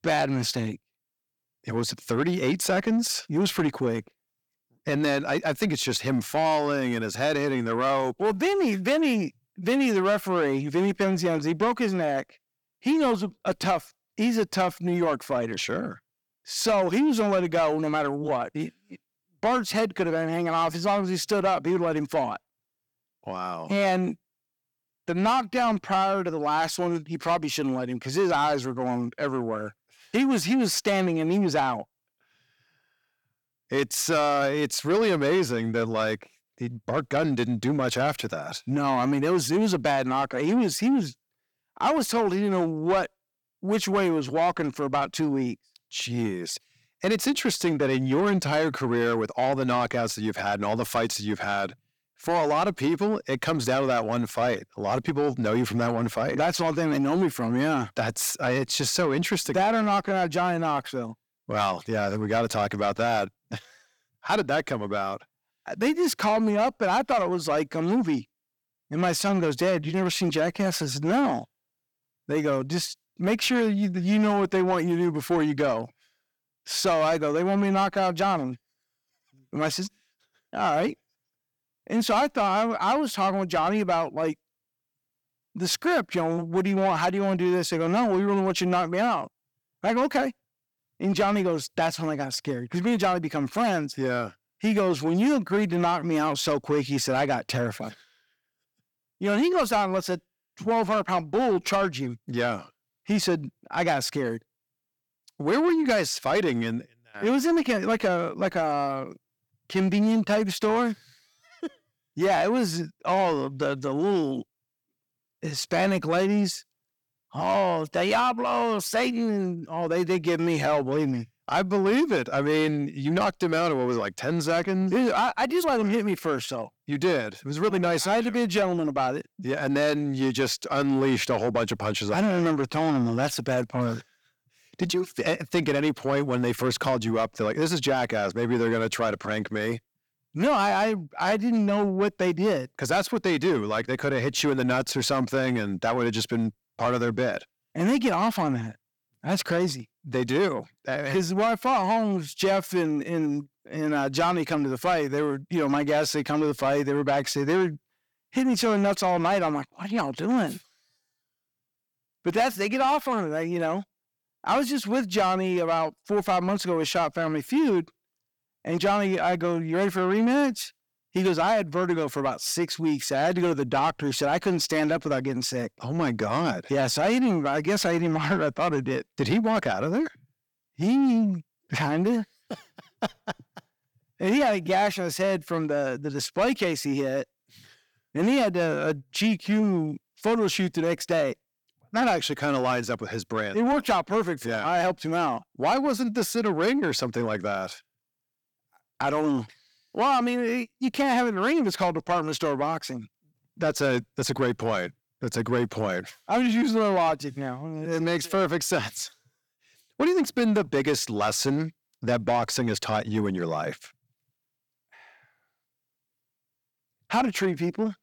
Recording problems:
distortion; slight; 10 dB below the speech

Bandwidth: 18.5 kHz